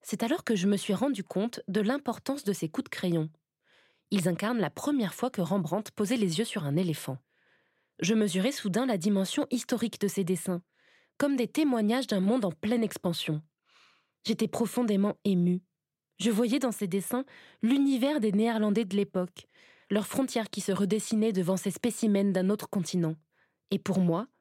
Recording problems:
none

